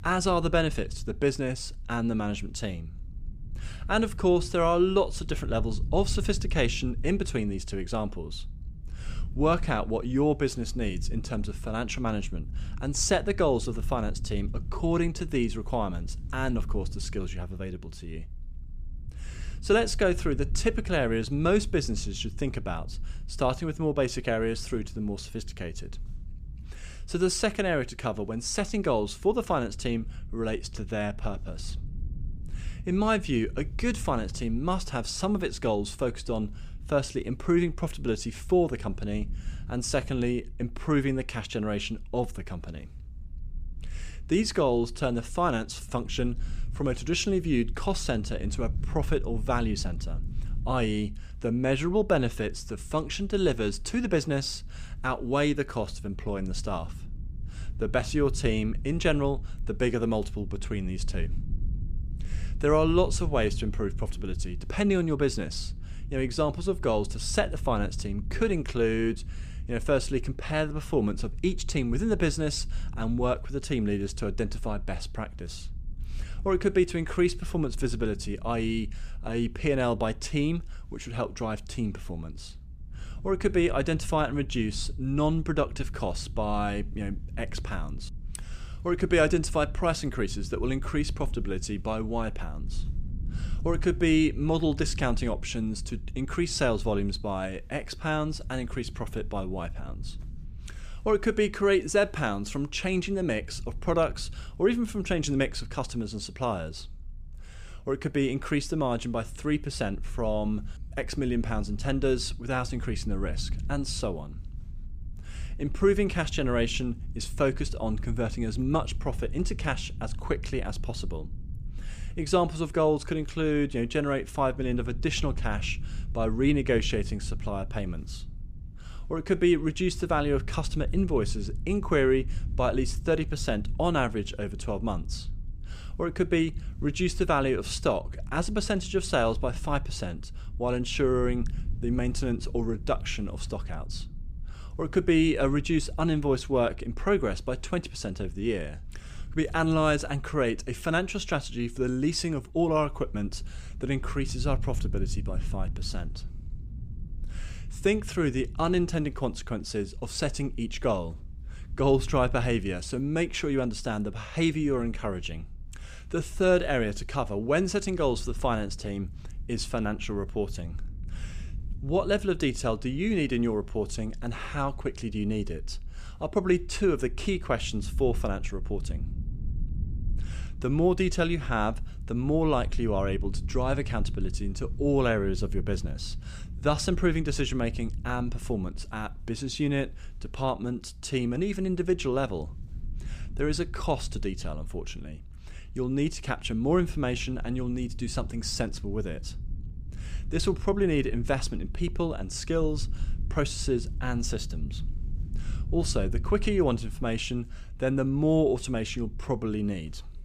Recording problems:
low rumble; faint; throughout; 25 dB below the speech

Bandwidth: 15 kHz